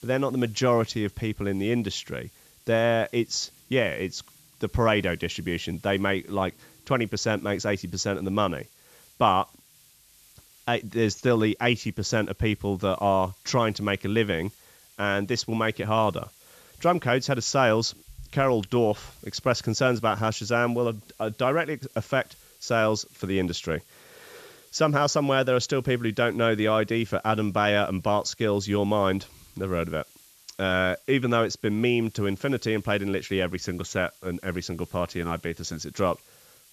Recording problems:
high frequencies cut off; noticeable; nothing above 8 kHz
hiss; faint; throughout; 25 dB below the speech

